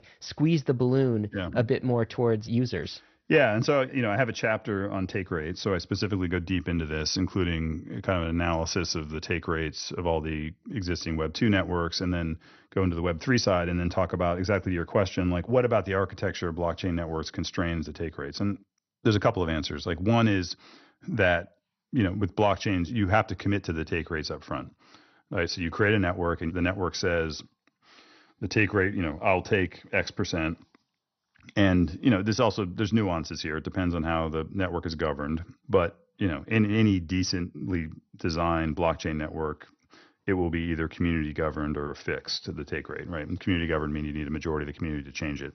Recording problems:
garbled, watery; slightly; nothing above 6 kHz

